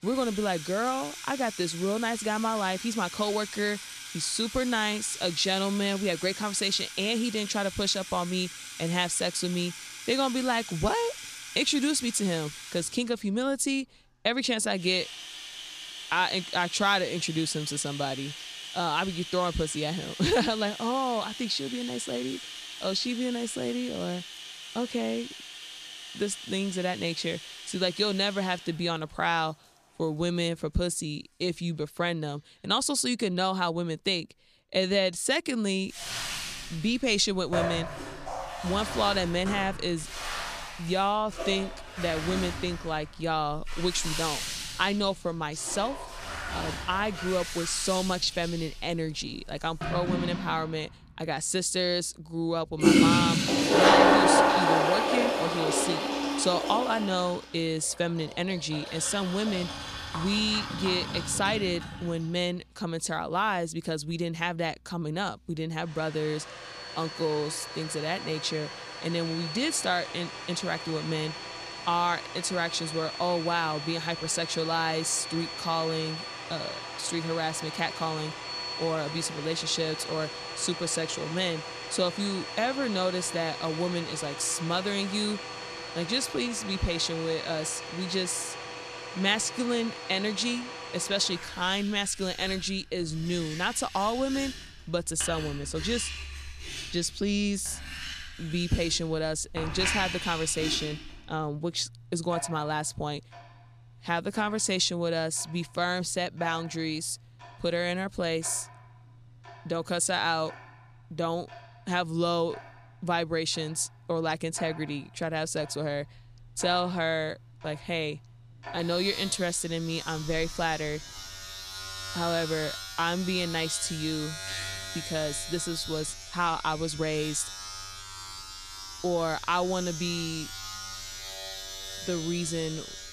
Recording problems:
household noises; loud; throughout; 4 dB below the speech

